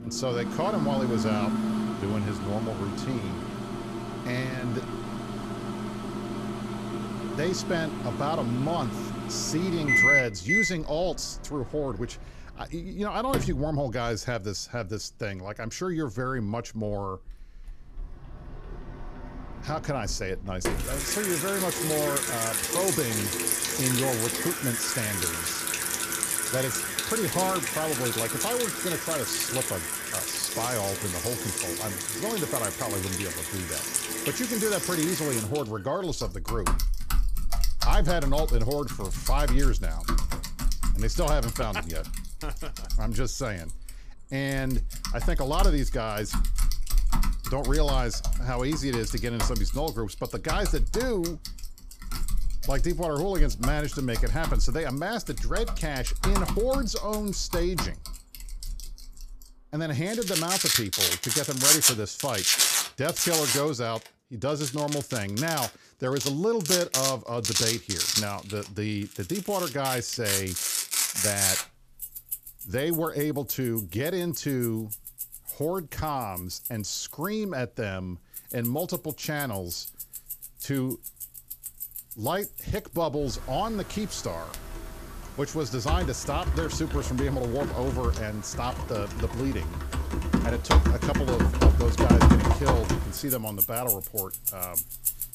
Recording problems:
household noises; very loud; throughout; 2 dB above the speech

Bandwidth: 14.5 kHz